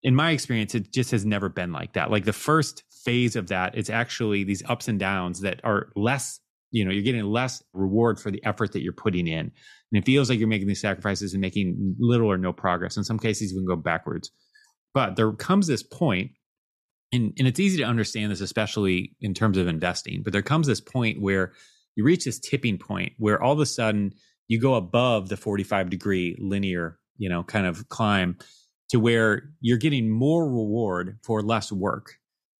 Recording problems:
none

